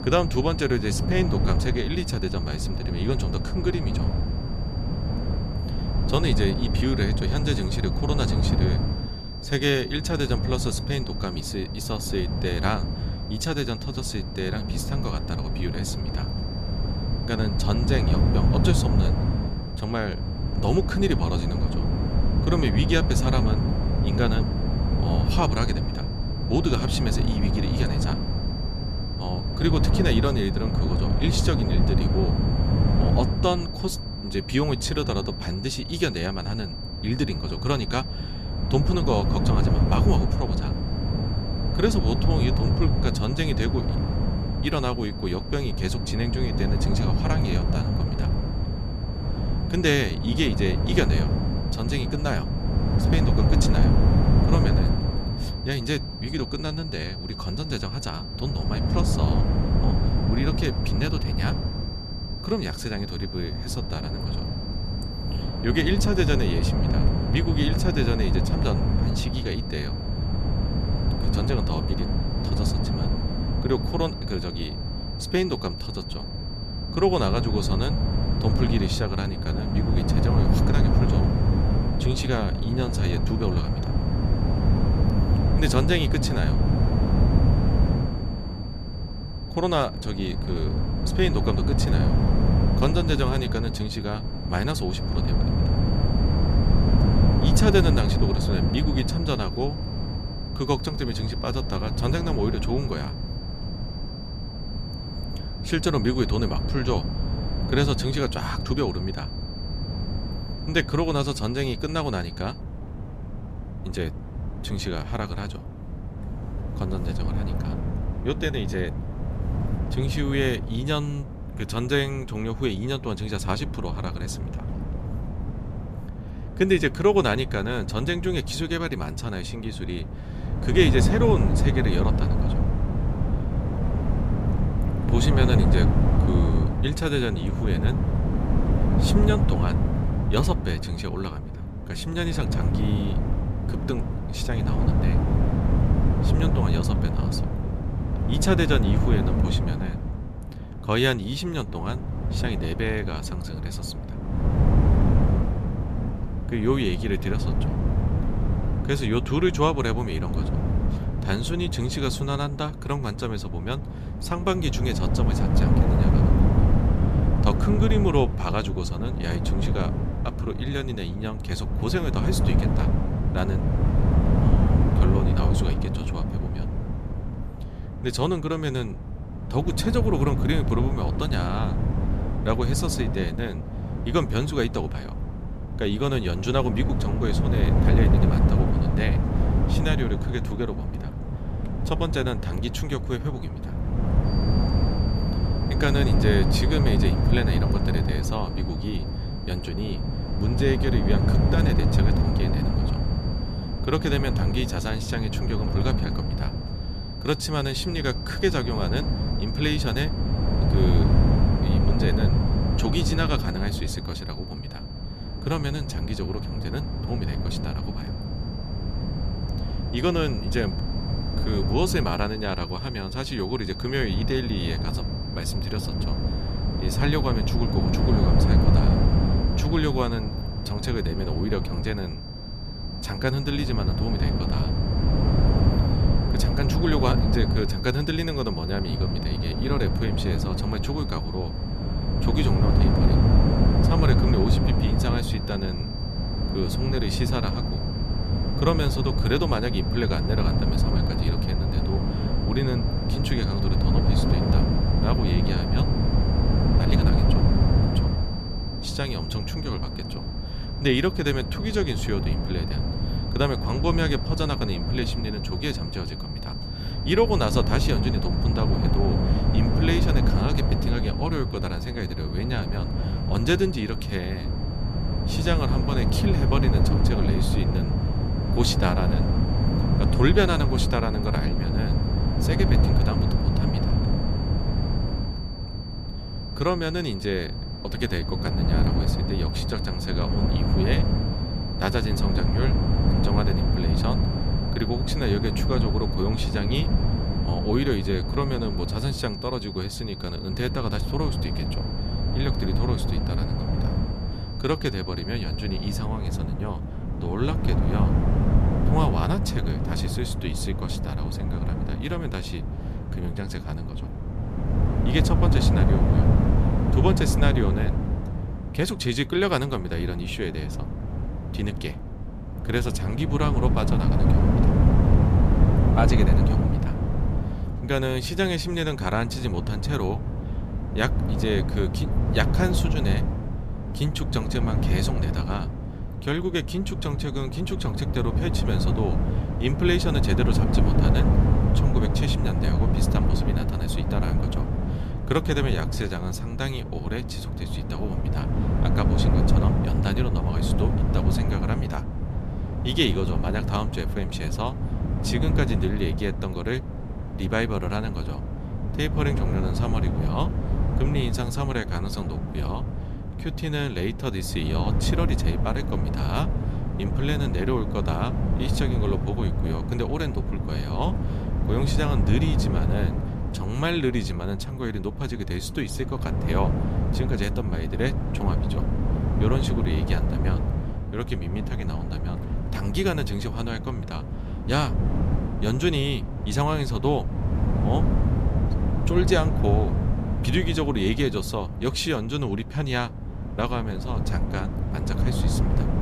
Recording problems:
wind noise on the microphone; heavy; 4 dB below the speech
high-pitched whine; noticeable; until 1:53 and from 3:14 to 5:06; 4.5 kHz, 10 dB below the speech

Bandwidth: 14.5 kHz